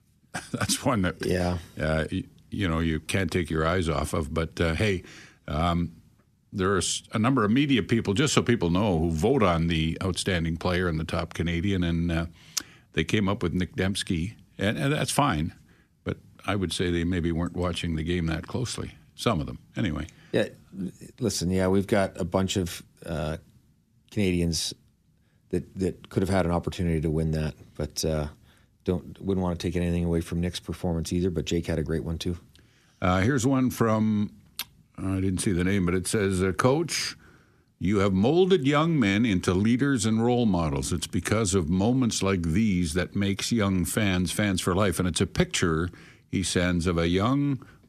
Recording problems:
none

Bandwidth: 14.5 kHz